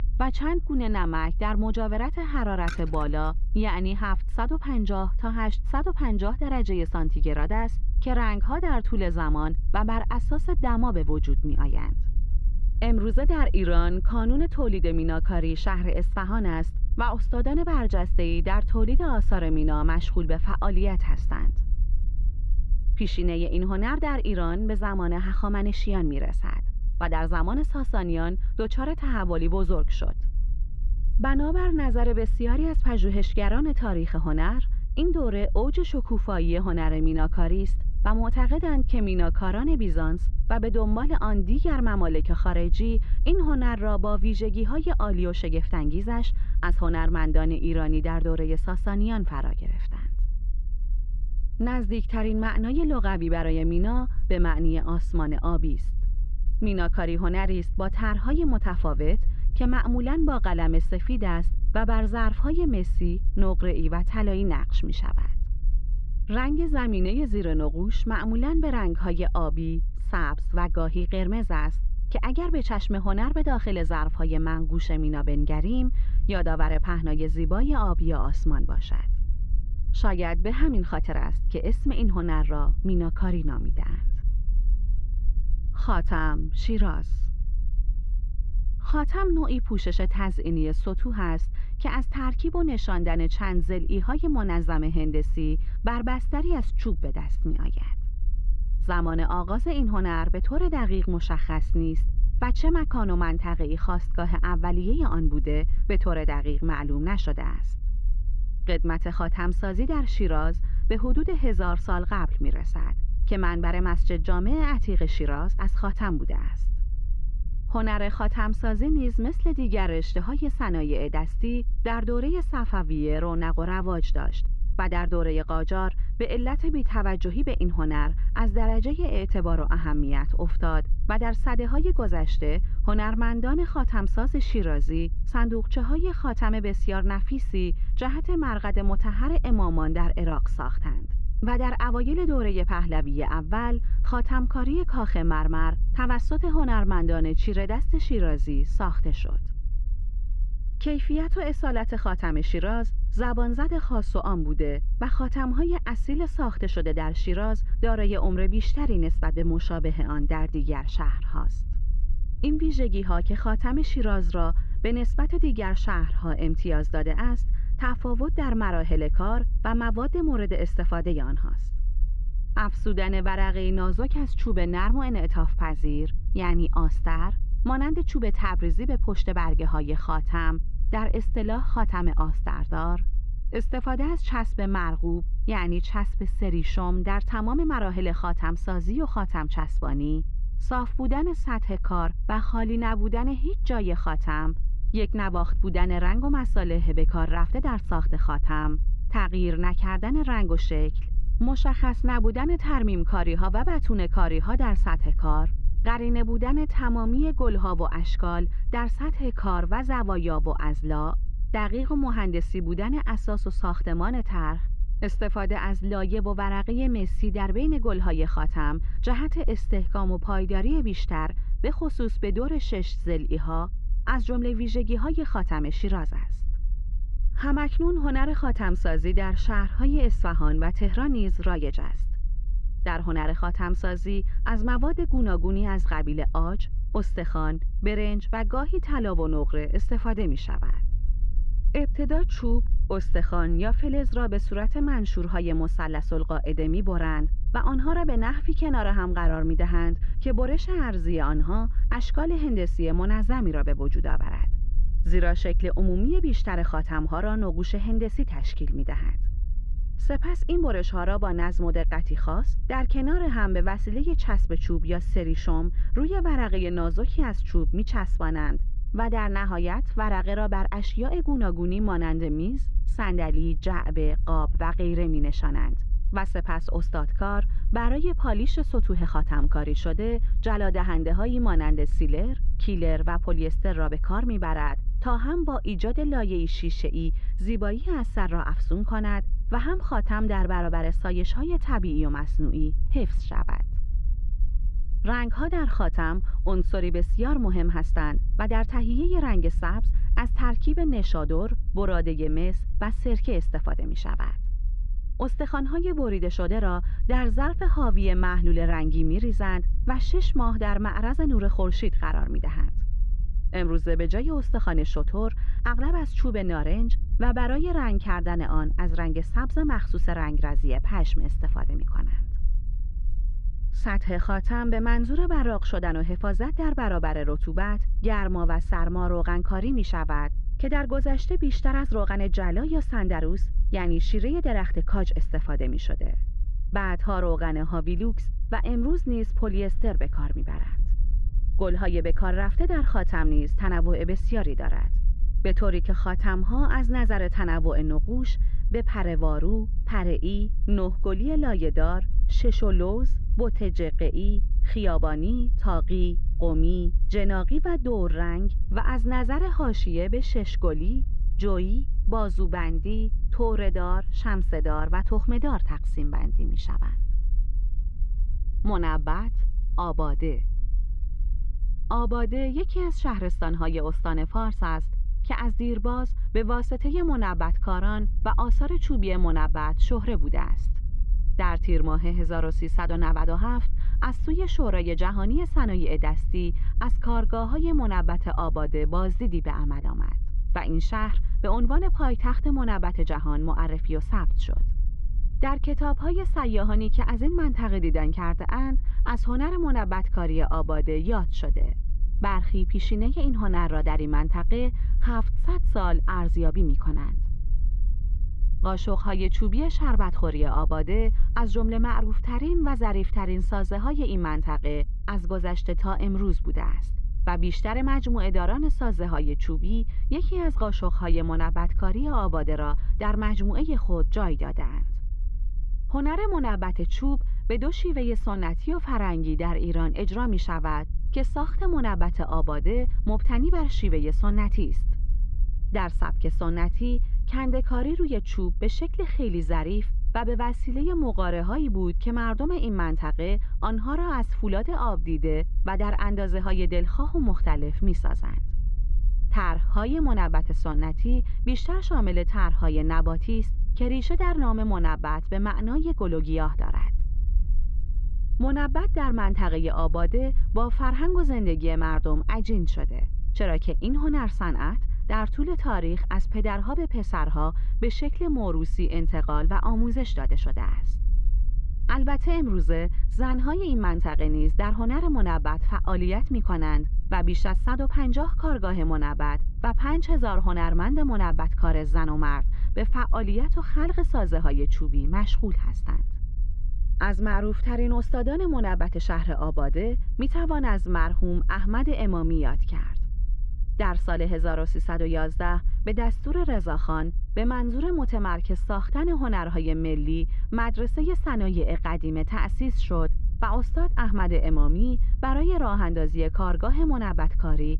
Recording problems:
muffled; very; fading above 3 kHz
low rumble; faint; throughout; 20 dB below the speech
jangling keys; noticeable; at 2.5 s; peak 8 dB below the speech

